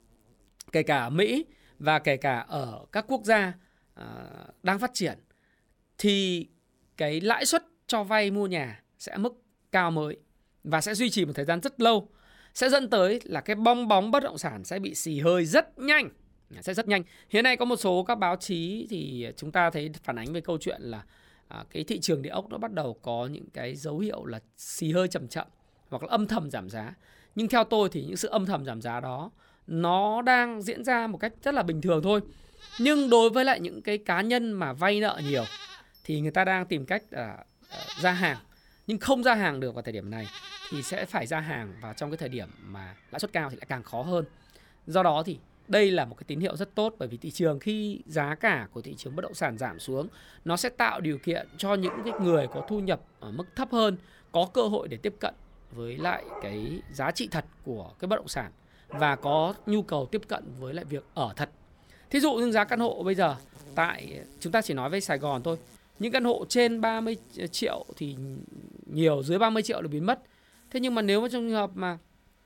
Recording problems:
animal sounds; noticeable; throughout; 20 dB below the speech
uneven, jittery; strongly; from 16 s to 1:12

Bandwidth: 17 kHz